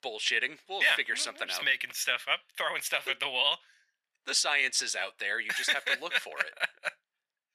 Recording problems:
thin; very; fading below 700 Hz

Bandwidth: 14 kHz